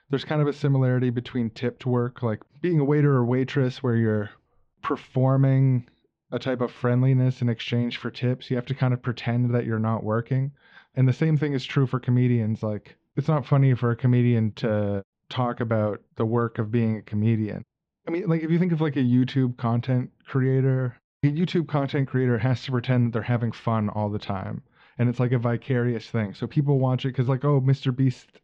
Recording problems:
muffled; slightly; fading above 3.5 kHz

